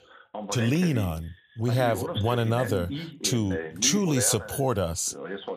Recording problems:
voice in the background; loud; throughout; 10 dB below the speech

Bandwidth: 14.5 kHz